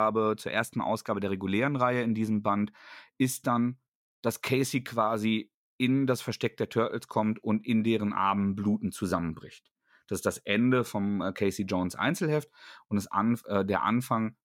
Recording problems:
abrupt cut into speech; at the start

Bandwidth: 16.5 kHz